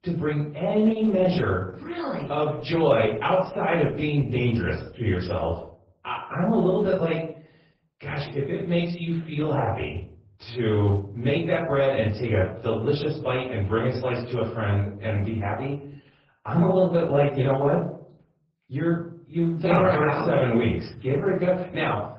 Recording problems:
off-mic speech; far
garbled, watery; badly
room echo; noticeable; dies away in 0.5 s

